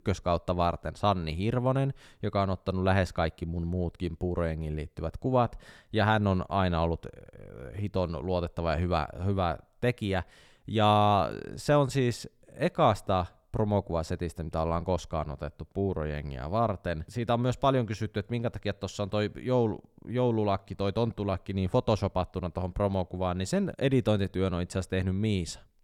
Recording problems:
none

